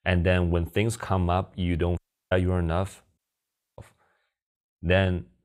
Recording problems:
audio cutting out; at 2 s and at 3 s for 0.5 s

